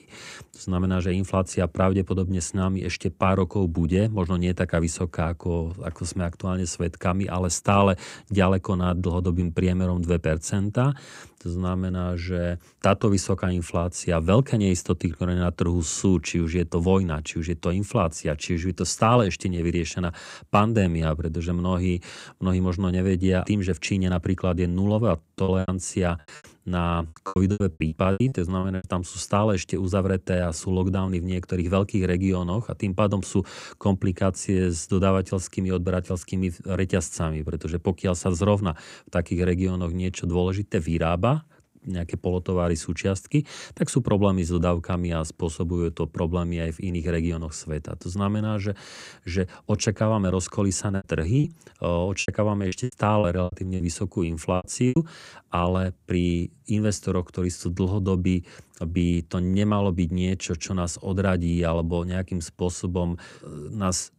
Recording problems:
choppy; very; from 25 to 29 s and from 51 to 55 s; 20% of the speech affected

